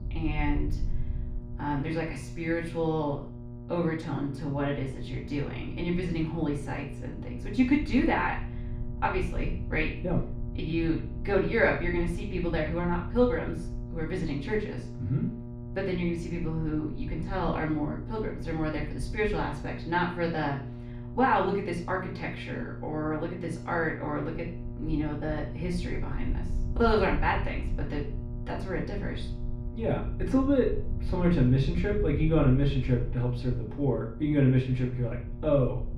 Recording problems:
off-mic speech; far
room echo; noticeable; dies away in 0.5 s
electrical hum; noticeable; throughout; 60 Hz, 15 dB below the speech
low rumble; faint; throughout; 25 dB below the speech

